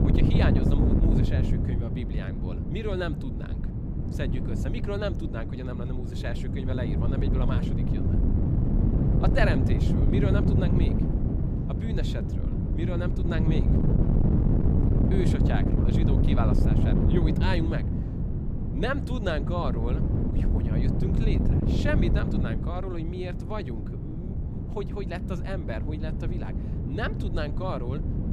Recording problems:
wind noise on the microphone; heavy; 1 dB below the speech

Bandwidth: 15 kHz